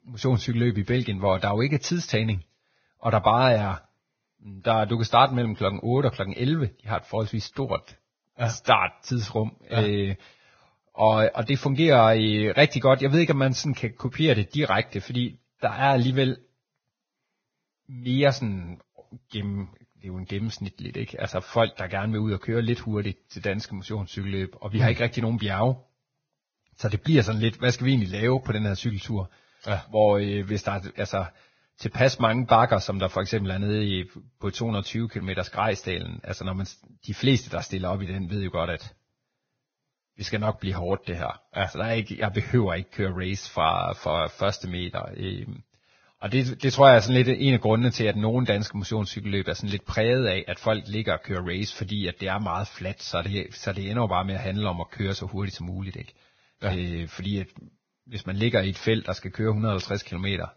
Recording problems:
garbled, watery; badly; nothing above 6.5 kHz

